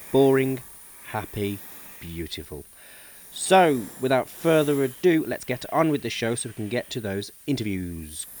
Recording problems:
hiss; noticeable; throughout; 15 dB below the speech
high-pitched whine; faint; throughout; 9.5 kHz, 25 dB below the speech
uneven, jittery; strongly; from 1 to 8 s

